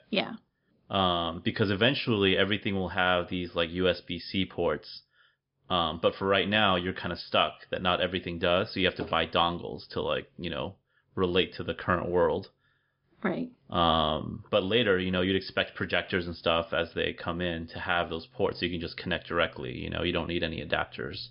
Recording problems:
high frequencies cut off; noticeable; nothing above 5.5 kHz

